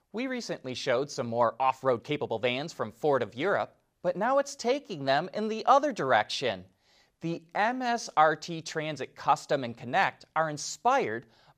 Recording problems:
uneven, jittery; strongly; from 1.5 to 8 s

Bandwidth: 15 kHz